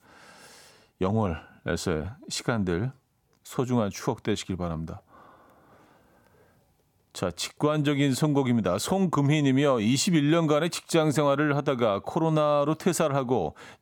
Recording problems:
none

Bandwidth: 17.5 kHz